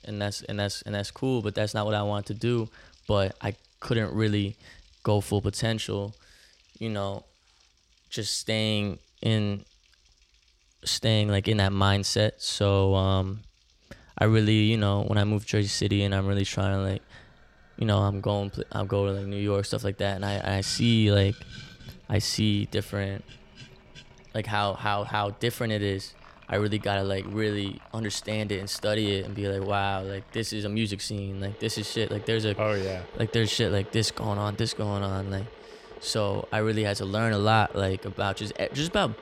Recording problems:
household noises; faint; throughout; 20 dB below the speech

